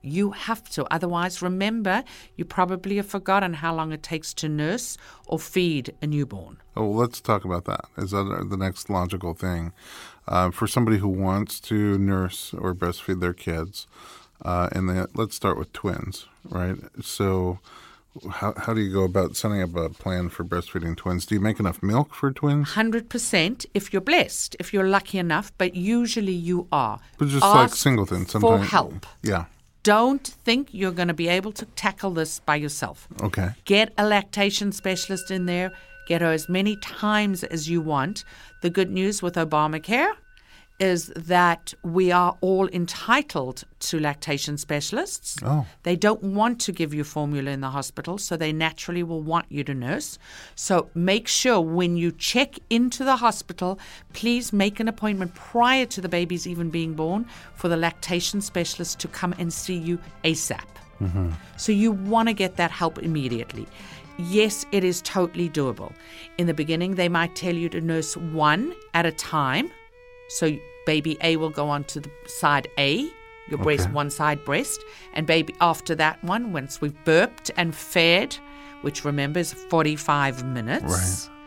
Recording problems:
background music; faint; throughout; 25 dB below the speech

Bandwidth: 16.5 kHz